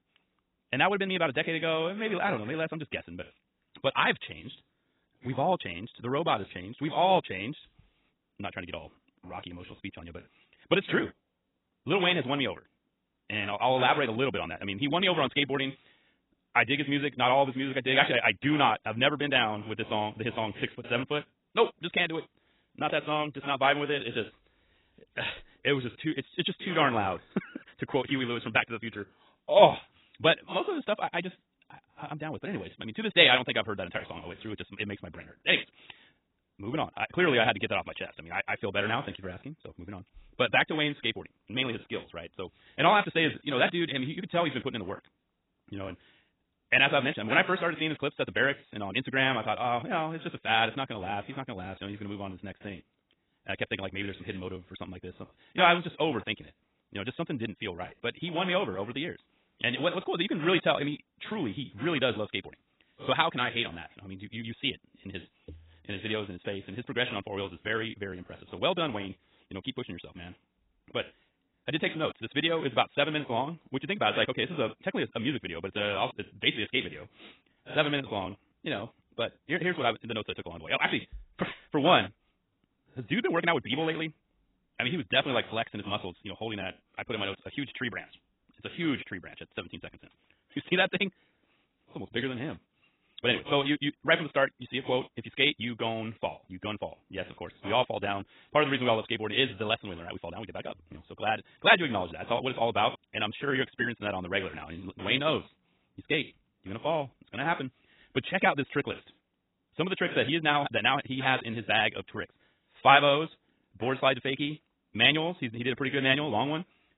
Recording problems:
garbled, watery; badly; nothing above 4 kHz
wrong speed, natural pitch; too fast; 1.6 times normal speed

